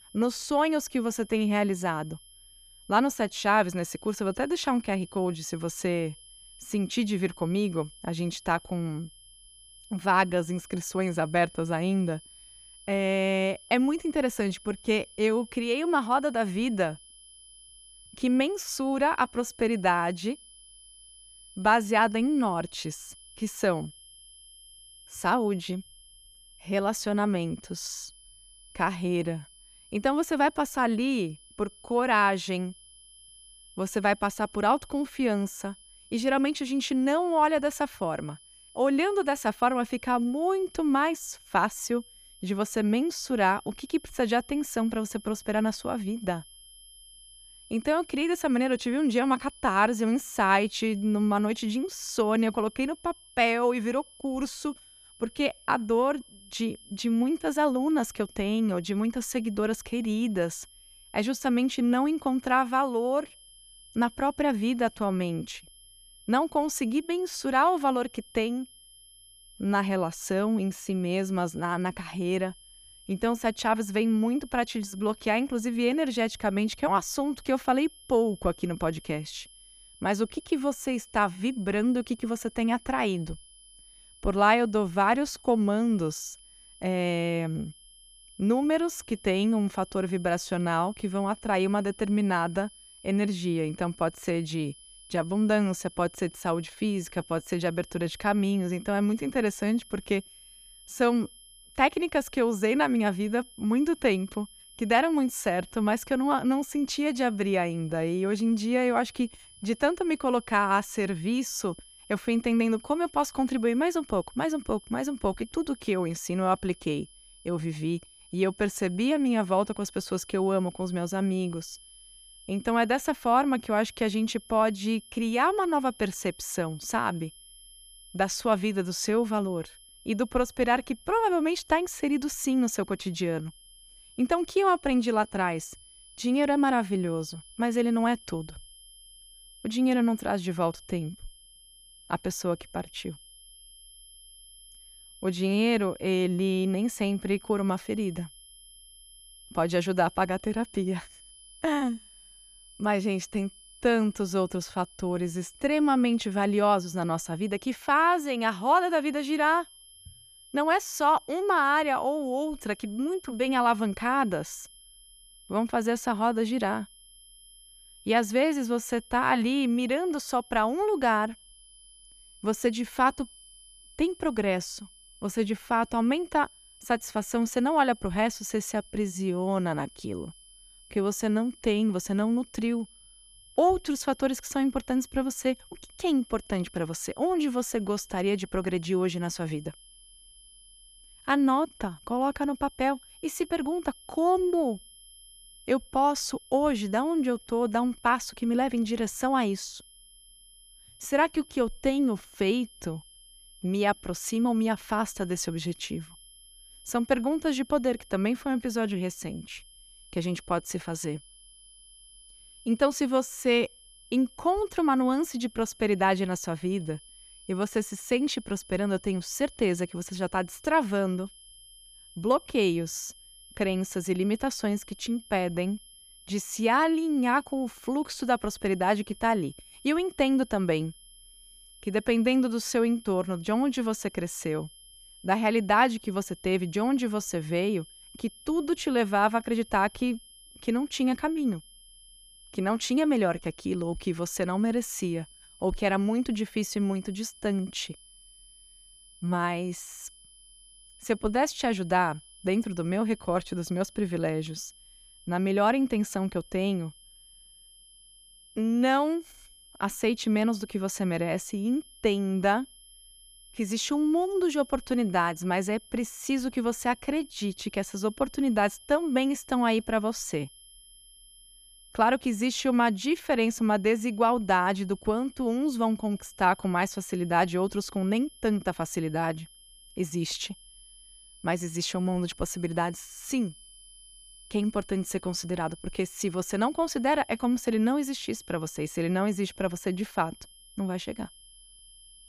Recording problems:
high-pitched whine; faint; throughout; 3 kHz, 25 dB below the speech

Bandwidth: 14.5 kHz